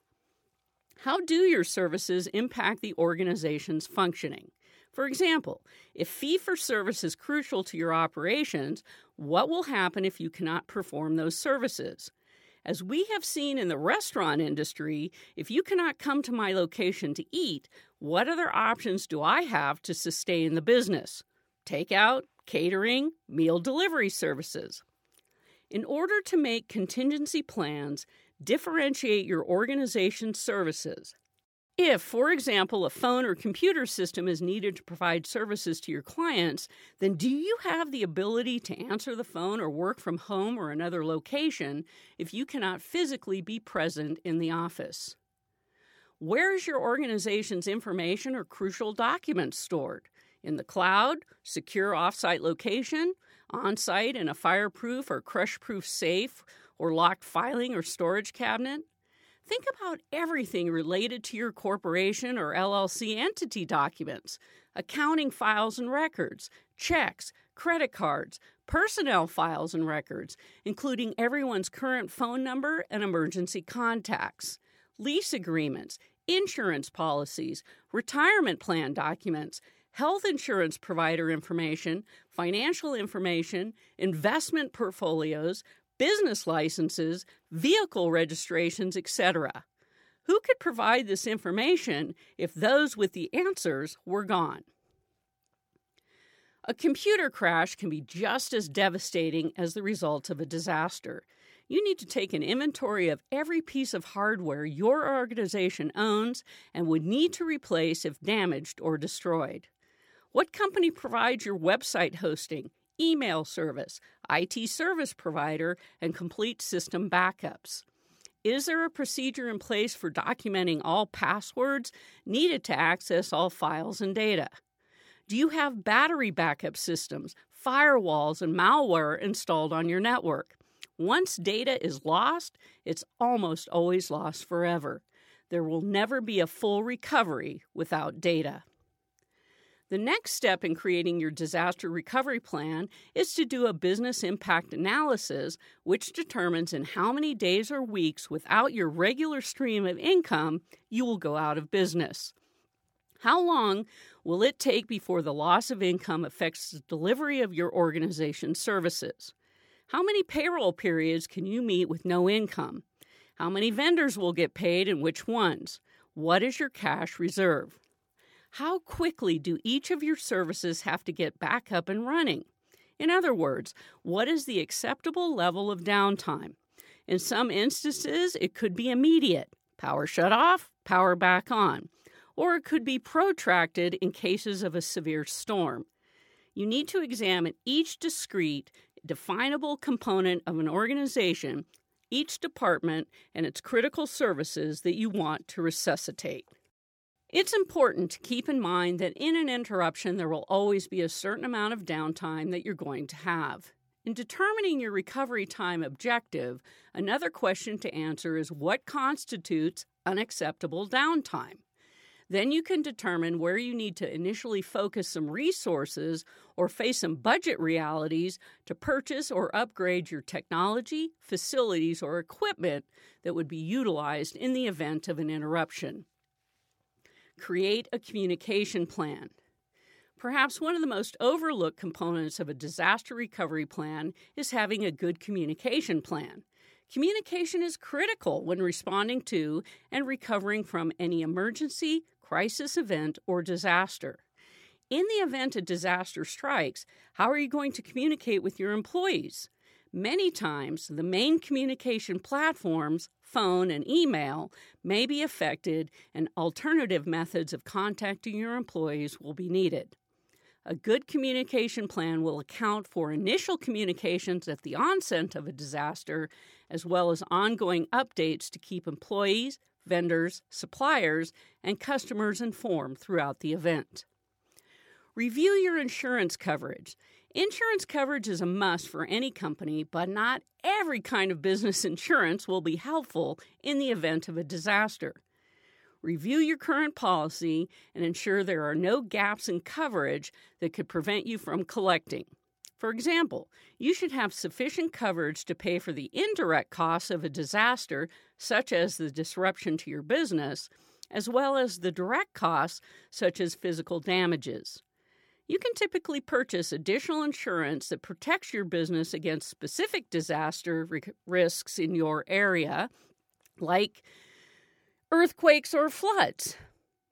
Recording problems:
none

